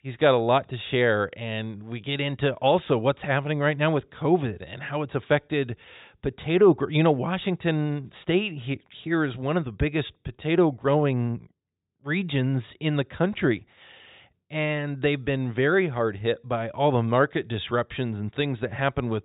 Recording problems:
high frequencies cut off; severe; nothing above 4 kHz

